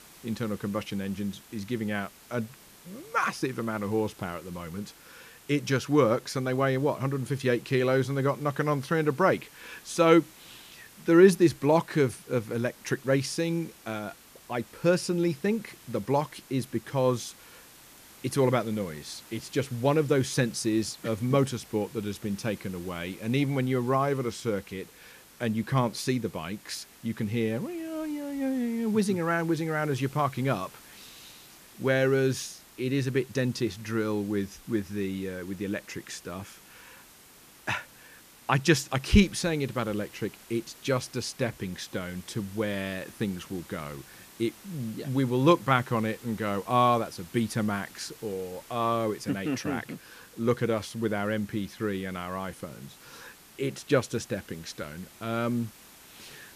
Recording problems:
hiss; faint; throughout; 20 dB below the speech

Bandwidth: 14.5 kHz